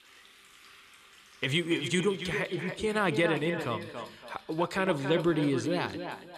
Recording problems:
echo of what is said; strong; throughout; 280 ms later, 8 dB below the speech
household noises; faint; throughout; 25 dB below the speech

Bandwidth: 14 kHz